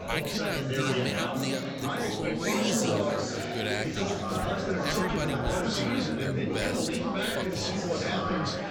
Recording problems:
chatter from many people; very loud; throughout; 5 dB above the speech

